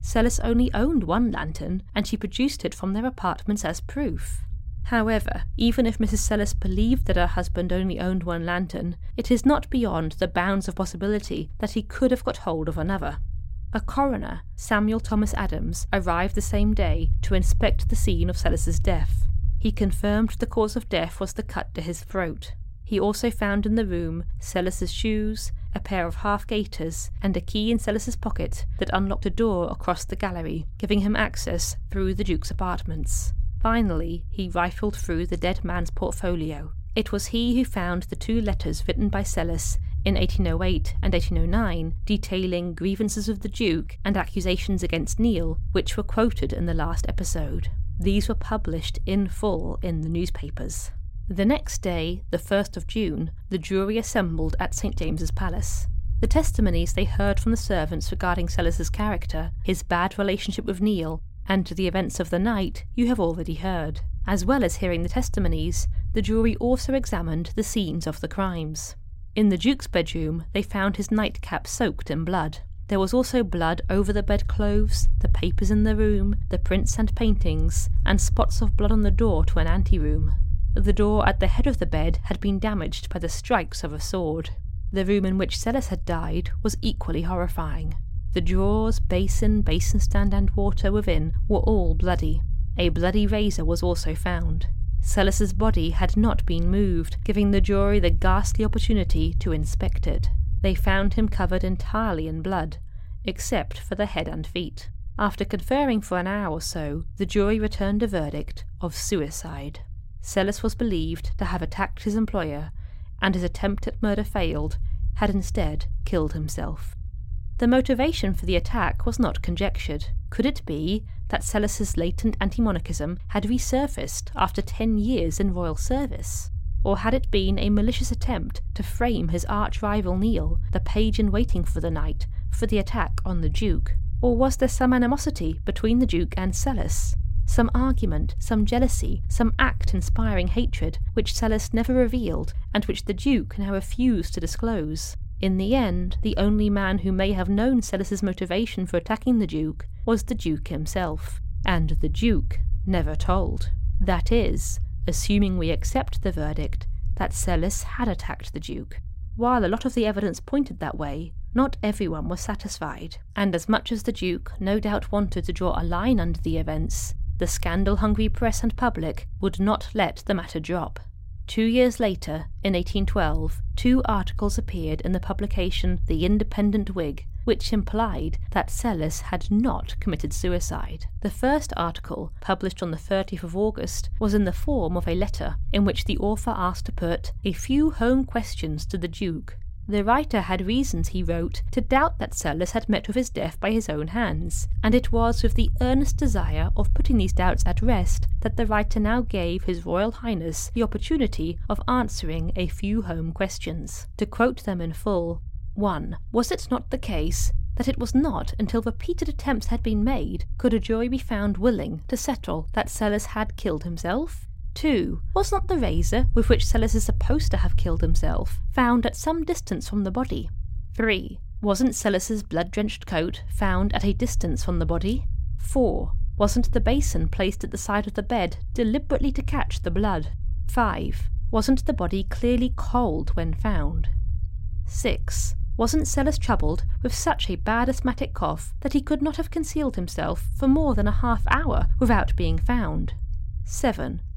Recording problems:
low rumble; faint; throughout; 25 dB below the speech

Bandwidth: 16 kHz